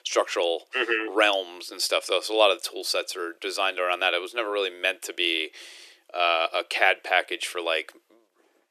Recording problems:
thin; very; fading below 350 Hz

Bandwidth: 13.5 kHz